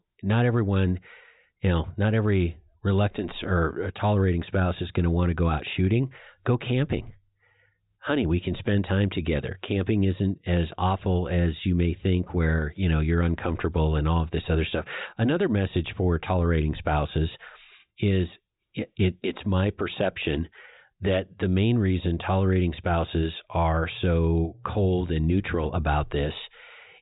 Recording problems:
high frequencies cut off; severe; nothing above 4 kHz

